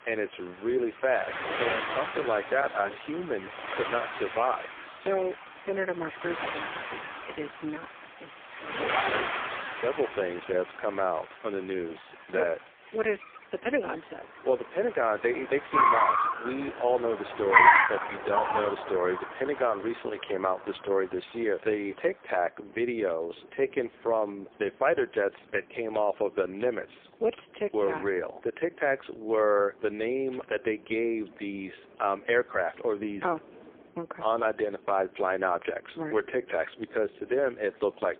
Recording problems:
phone-call audio; poor line
traffic noise; very loud; throughout; 2 dB above the speech

